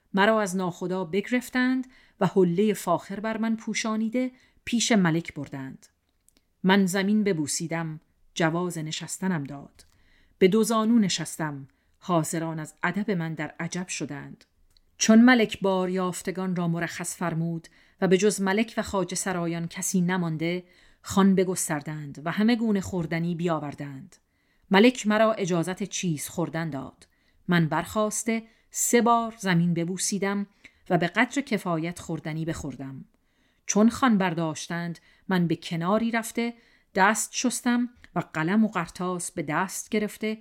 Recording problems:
none

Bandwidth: 16.5 kHz